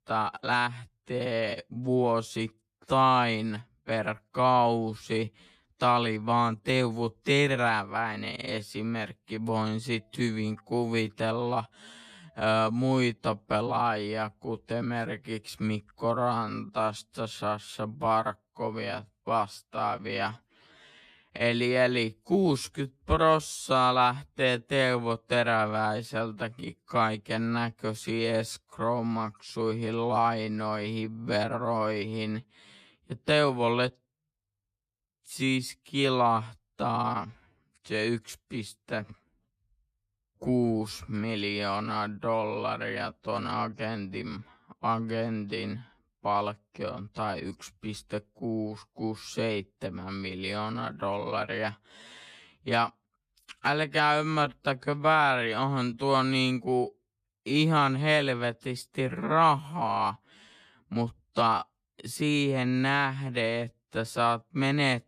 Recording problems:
wrong speed, natural pitch; too slow; 0.6 times normal speed

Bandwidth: 14.5 kHz